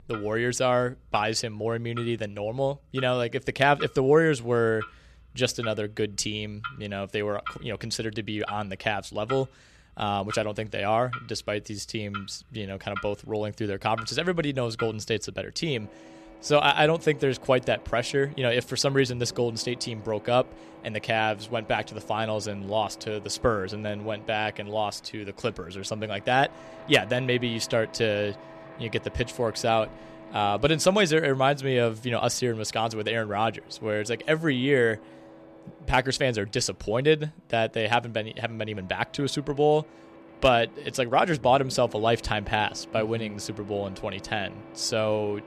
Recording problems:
household noises; noticeable; throughout; 20 dB below the speech

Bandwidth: 14 kHz